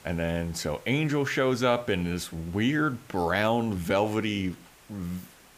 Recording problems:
hiss; faint; throughout; 25 dB below the speech

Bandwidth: 15 kHz